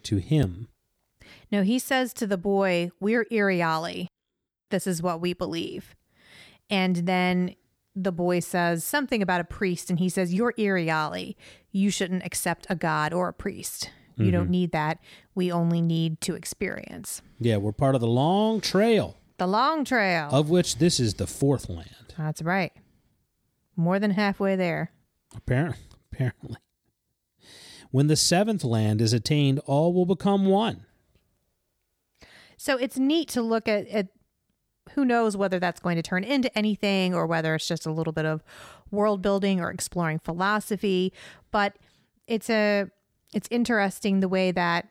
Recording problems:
none

